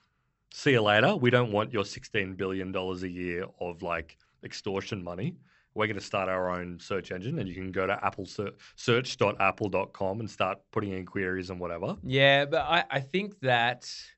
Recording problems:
high frequencies cut off; noticeable; nothing above 8 kHz

